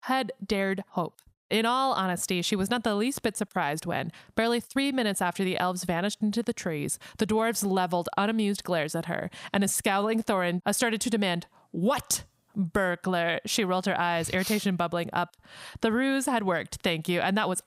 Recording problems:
squashed, flat; somewhat

